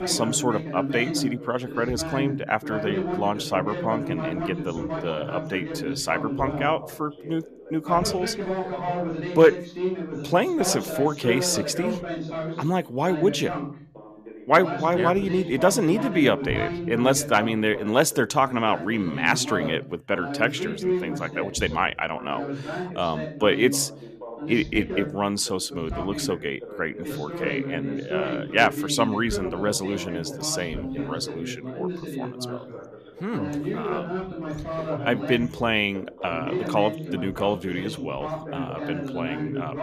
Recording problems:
background chatter; loud; throughout; 2 voices, 6 dB below the speech

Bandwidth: 14.5 kHz